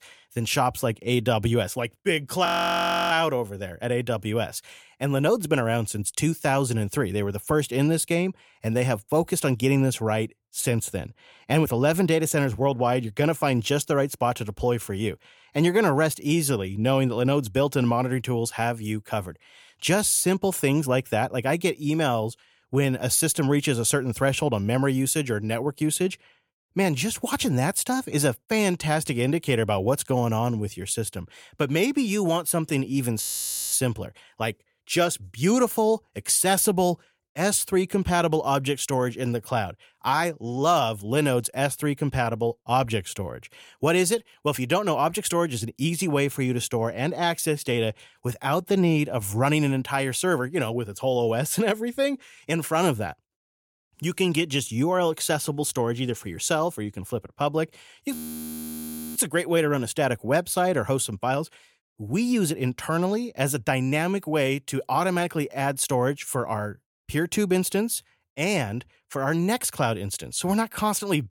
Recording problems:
audio freezing; at 2.5 s for 0.5 s, at 33 s for 0.5 s and at 58 s for 1 s

